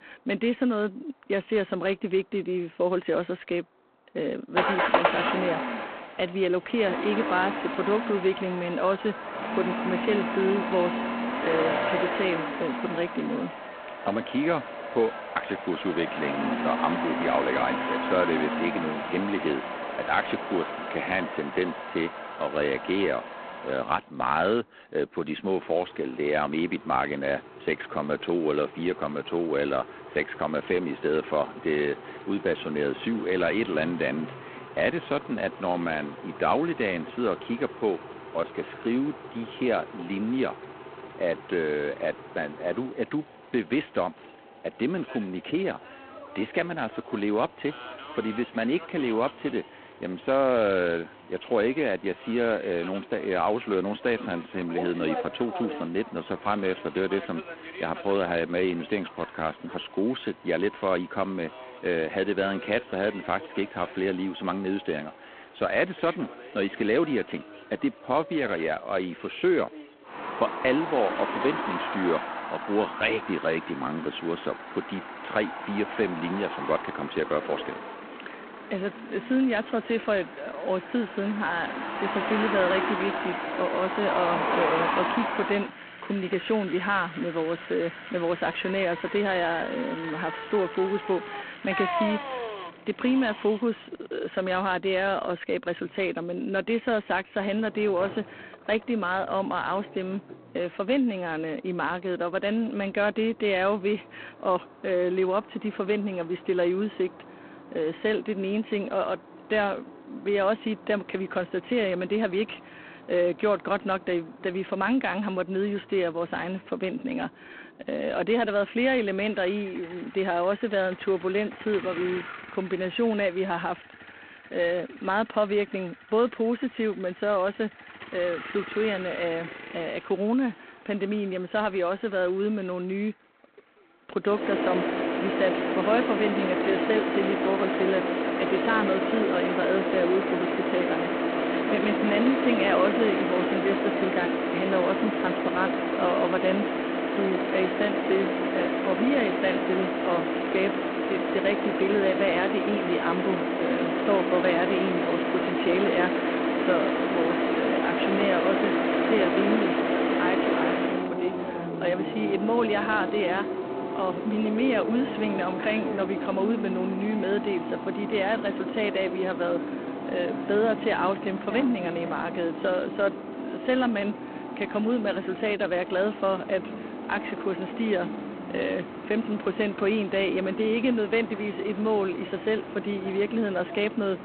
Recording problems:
phone-call audio; poor line
traffic noise; loud; throughout; 3 dB below the speech

